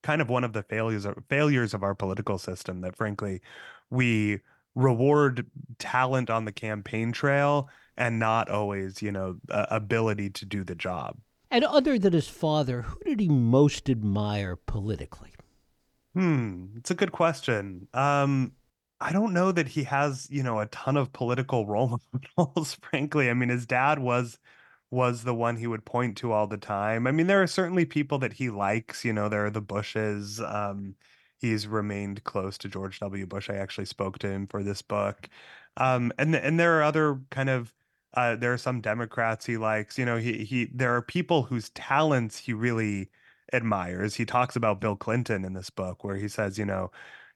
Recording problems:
none

